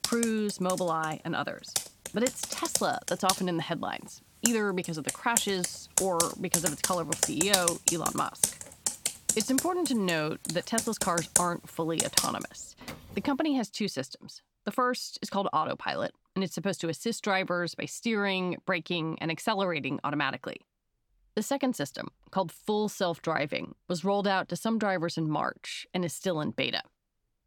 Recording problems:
household noises; very loud; until 13 s; 1 dB above the speech

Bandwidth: 18 kHz